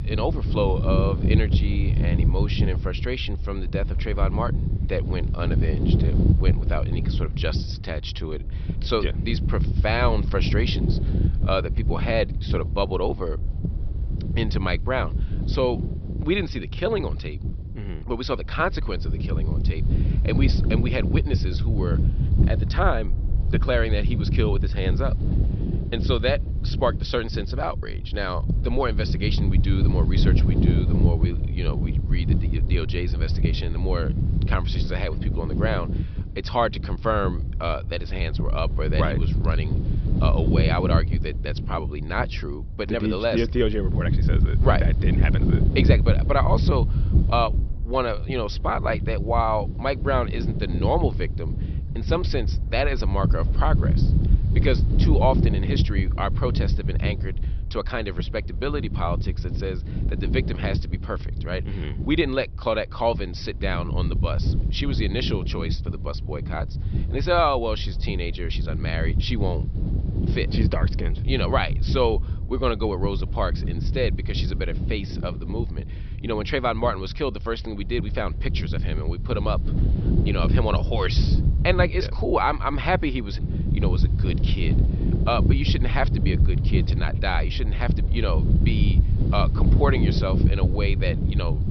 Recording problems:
high frequencies cut off; noticeable; nothing above 5.5 kHz
wind noise on the microphone; heavy; 9 dB below the speech

